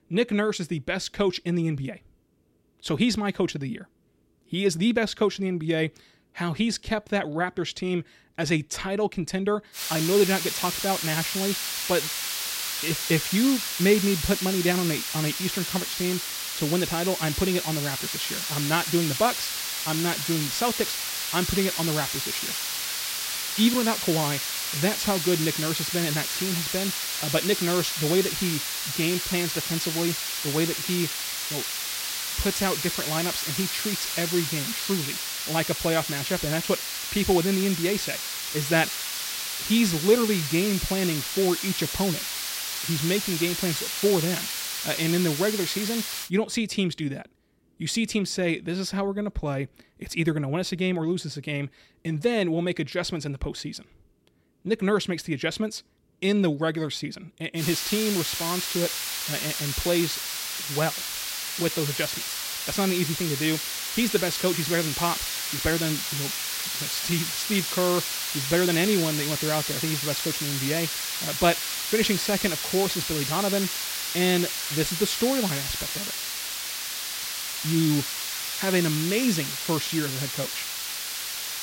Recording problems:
hiss; loud; from 10 to 46 s and from 58 s on; 1 dB below the speech

